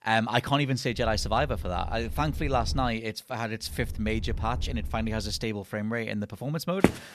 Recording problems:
low rumble; faint; from 1 to 3 s and from 3.5 to 5.5 s; 25 dB below the speech
footsteps; very faint; at 7 s; peak 3 dB above the speech

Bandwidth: 13.5 kHz